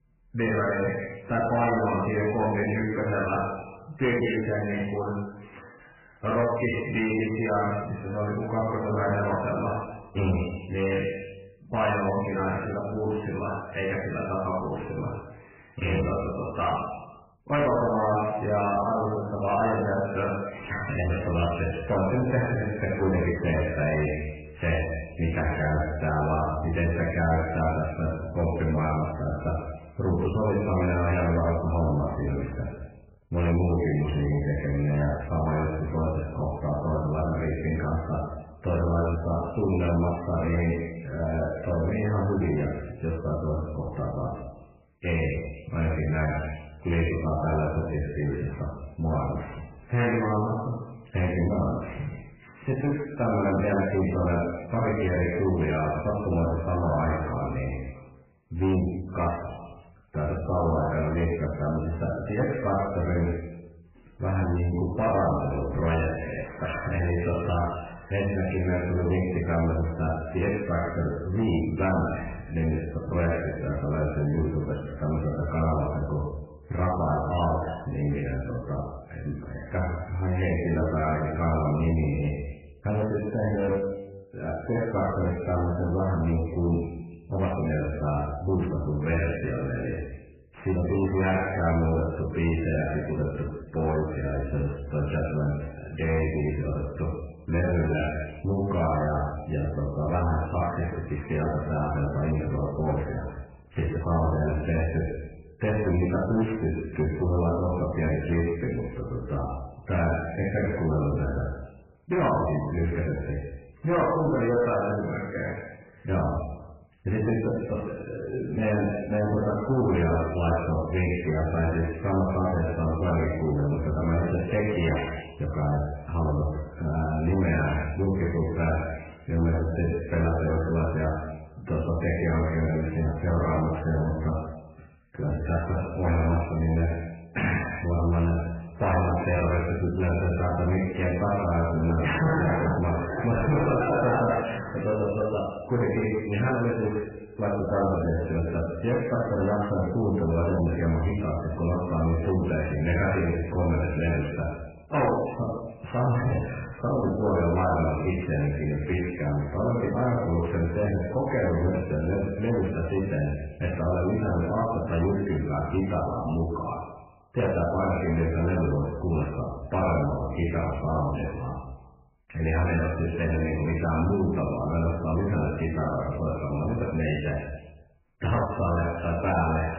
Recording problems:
room echo; strong; dies away in 0.9 s
off-mic speech; far
garbled, watery; badly; nothing above 3 kHz
distortion; slight; 9 dB below the speech

